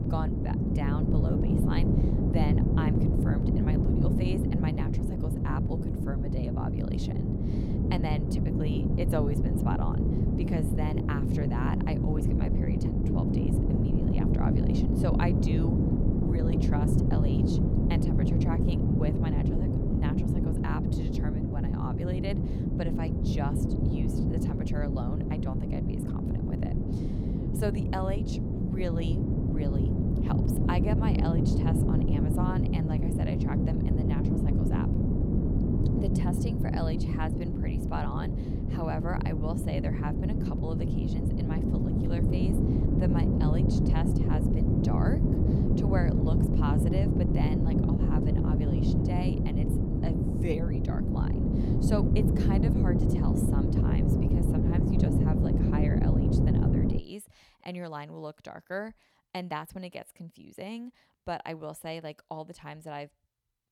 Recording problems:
wind noise on the microphone; heavy; until 57 s; 4 dB above the speech

